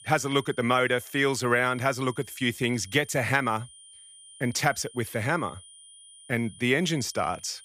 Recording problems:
high-pitched whine; faint; throughout; 9.5 kHz, 20 dB below the speech

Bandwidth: 15 kHz